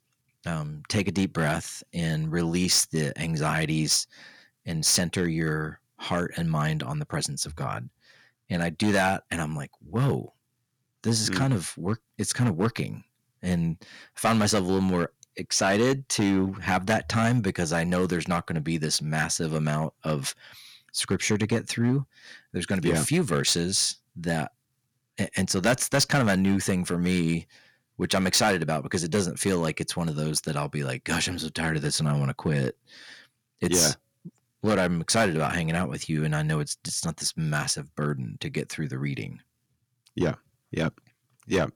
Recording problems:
distortion; slight; 3% of the sound clipped

